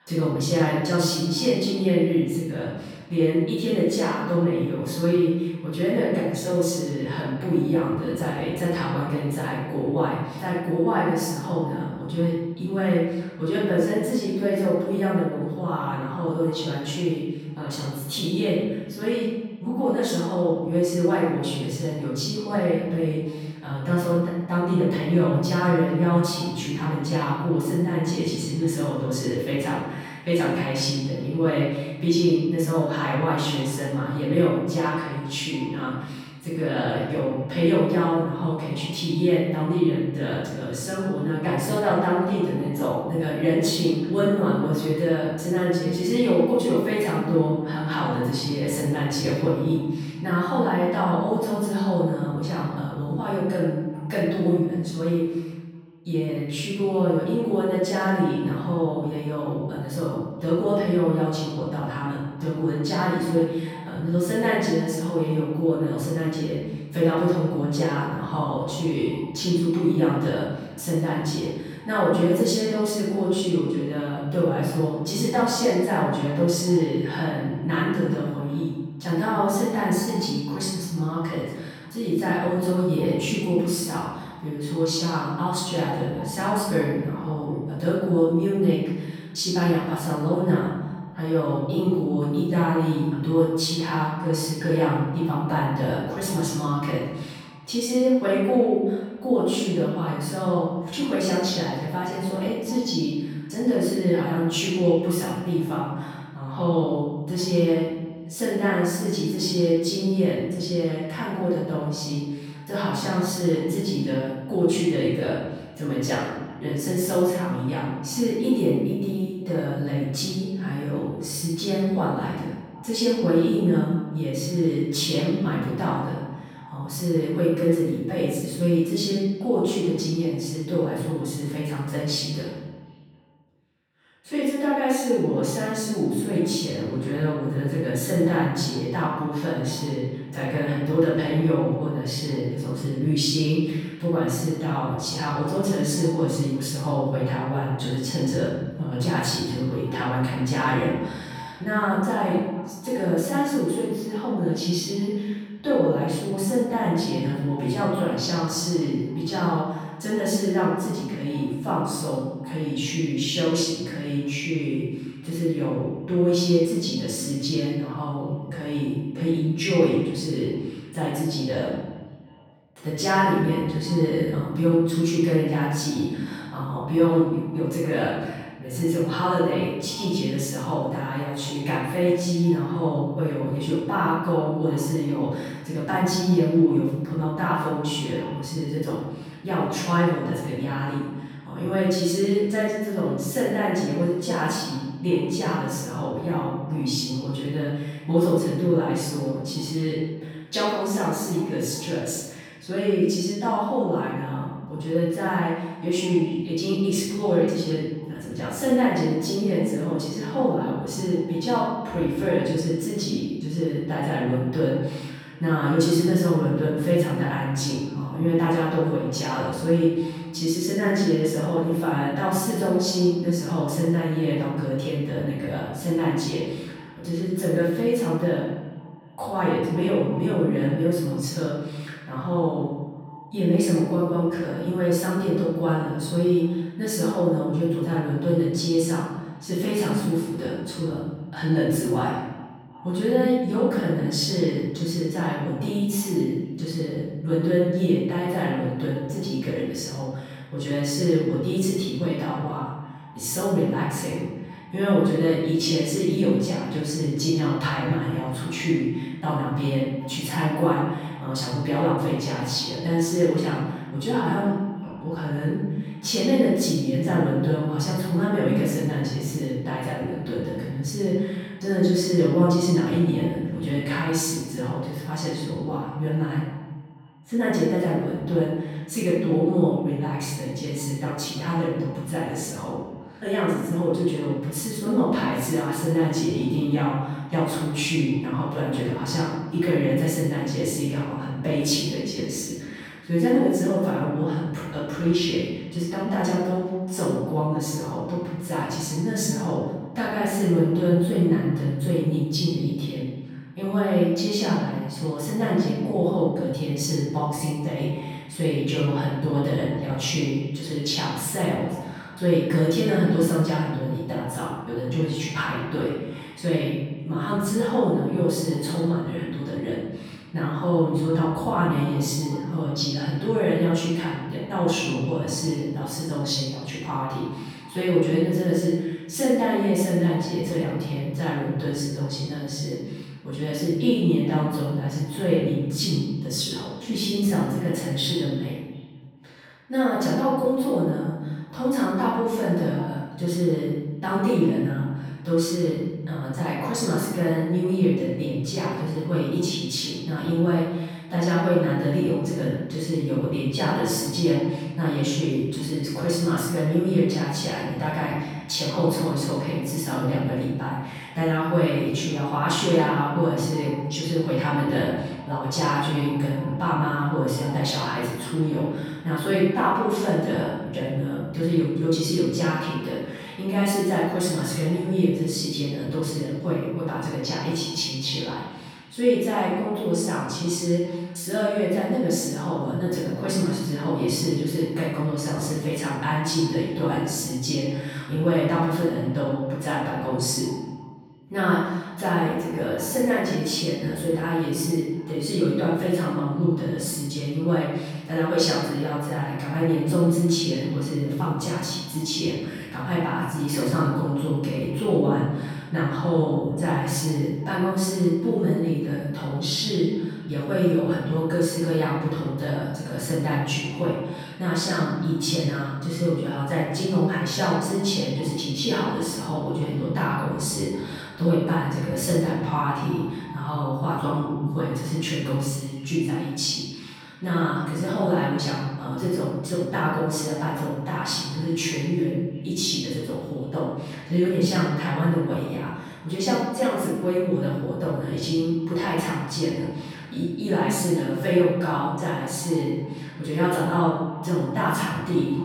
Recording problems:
room echo; strong; dies away in 1.1 s
off-mic speech; far
echo of what is said; faint; throughout; 370 ms later, 25 dB below the speech

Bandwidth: 18.5 kHz